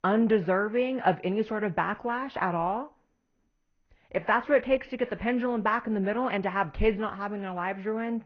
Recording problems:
garbled, watery; slightly; nothing above 6 kHz
muffled; very slightly; fading above 2.5 kHz

